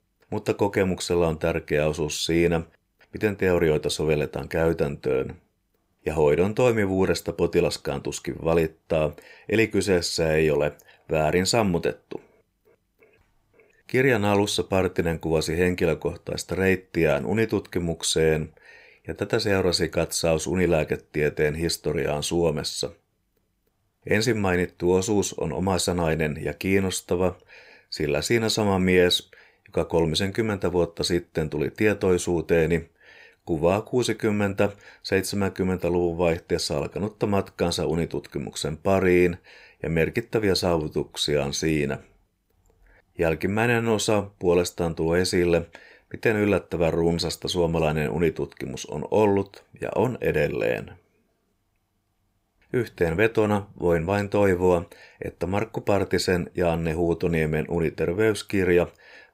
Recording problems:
none

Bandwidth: 15.5 kHz